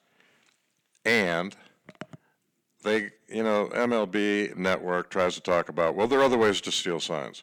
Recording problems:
distortion; slight; 3% of the sound clipped

